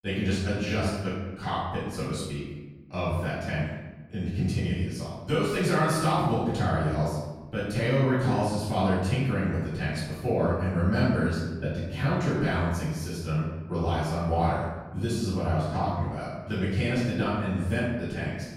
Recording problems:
room echo; strong; dies away in 1.1 s
off-mic speech; far

